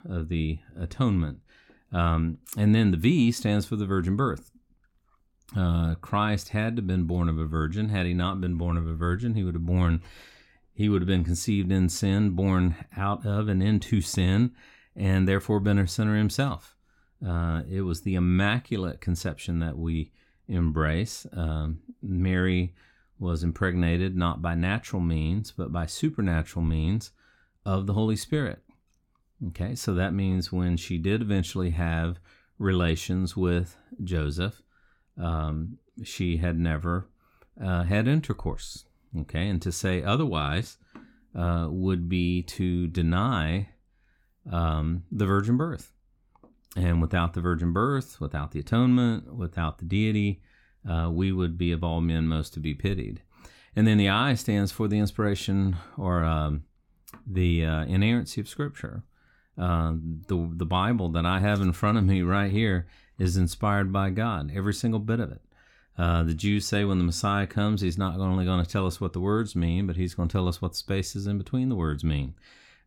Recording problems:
none

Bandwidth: 17 kHz